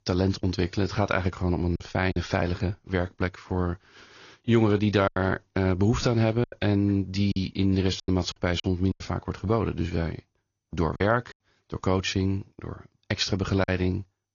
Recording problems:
garbled, watery; slightly; nothing above 6.5 kHz
choppy; very; 5% of the speech affected

